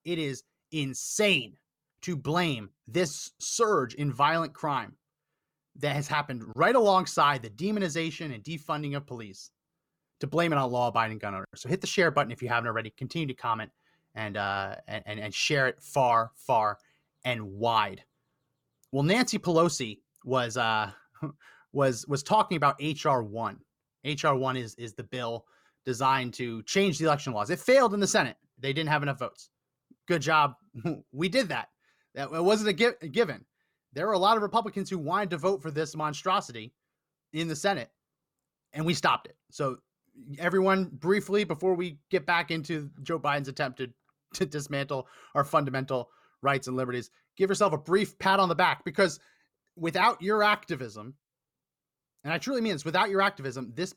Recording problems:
none

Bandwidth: 17.5 kHz